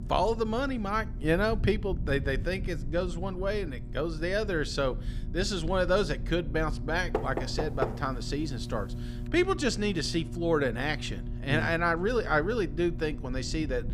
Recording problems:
electrical hum; faint; throughout; 60 Hz, 20 dB below the speech
low rumble; faint; throughout; 25 dB below the speech
door banging; noticeable; at 7 s; peak 4 dB below the speech

